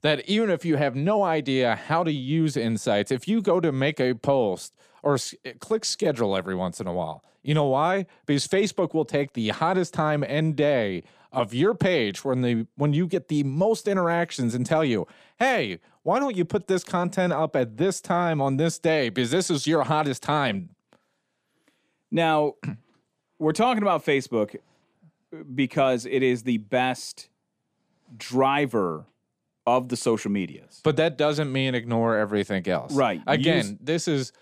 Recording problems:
none

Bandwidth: 14.5 kHz